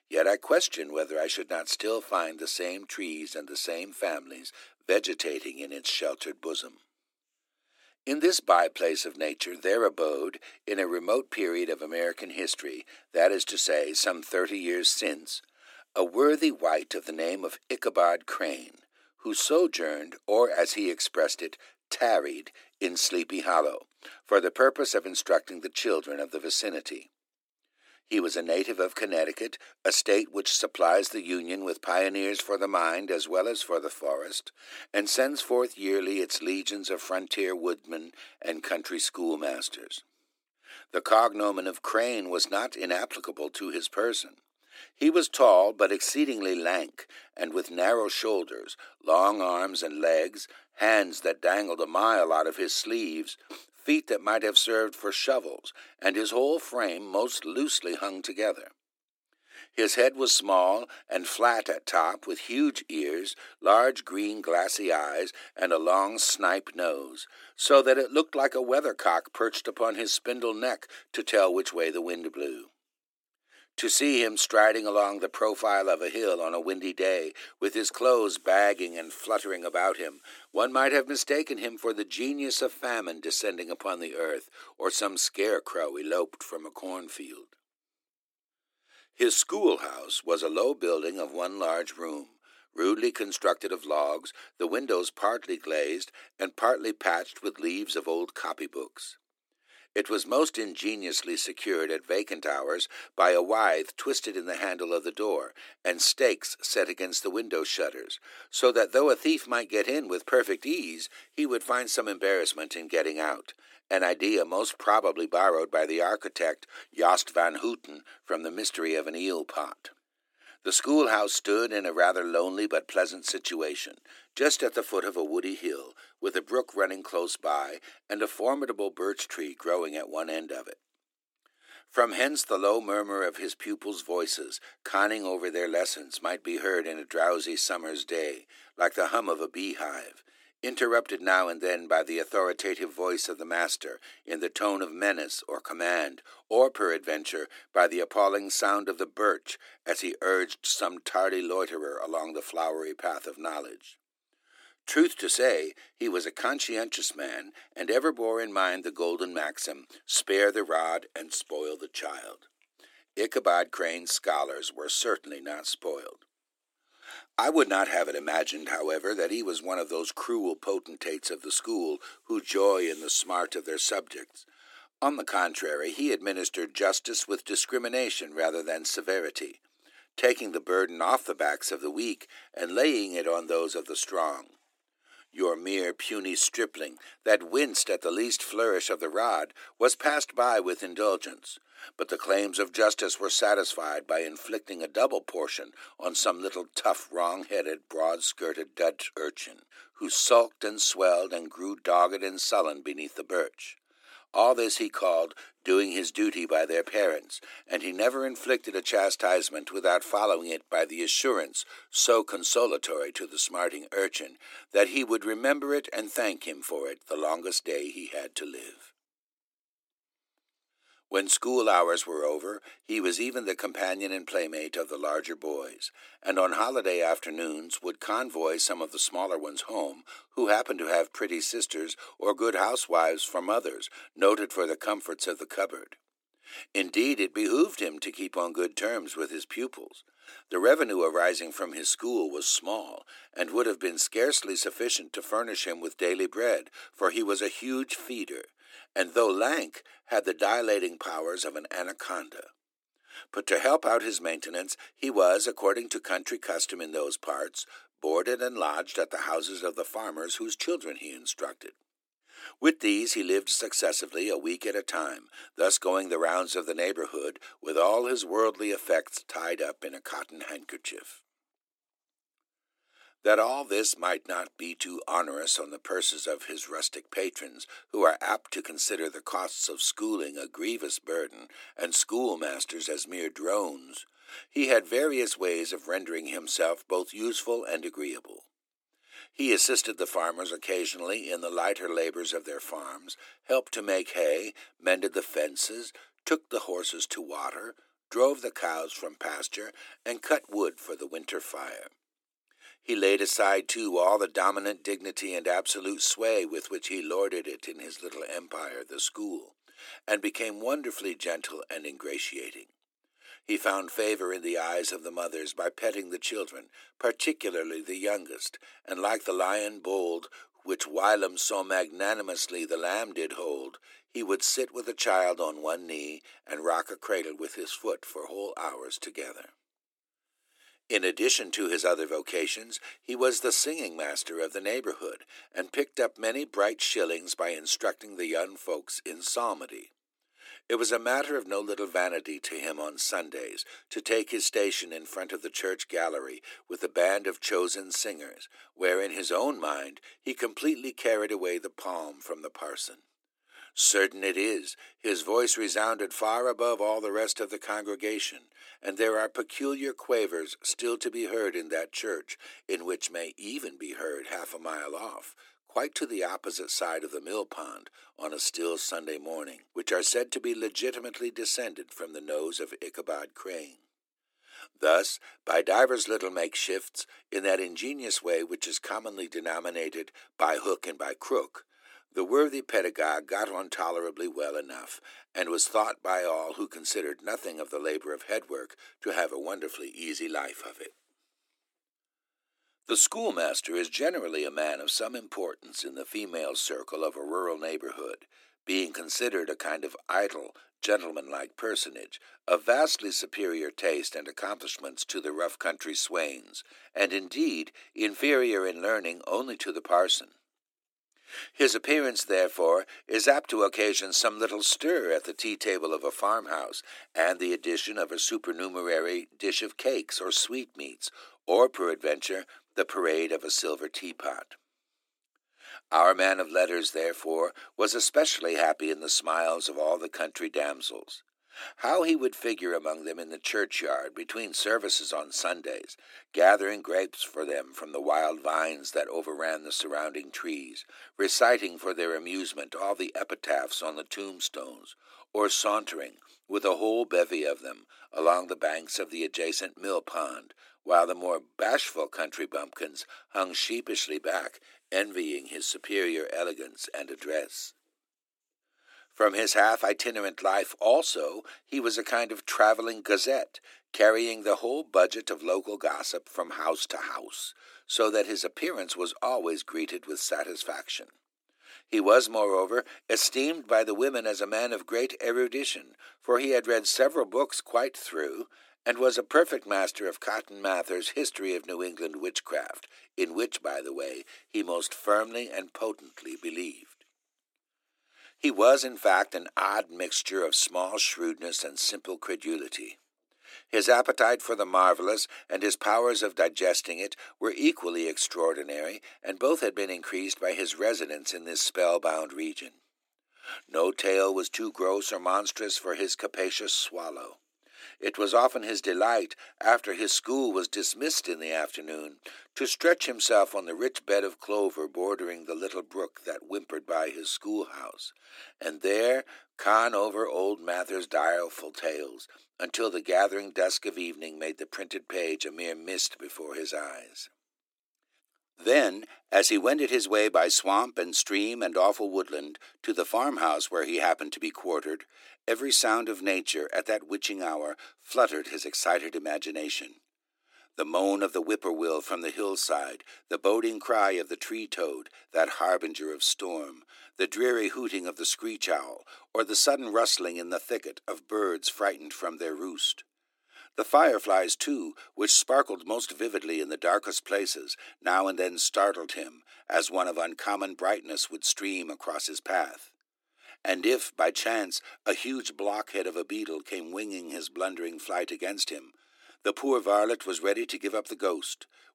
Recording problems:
thin; somewhat; fading below 300 Hz

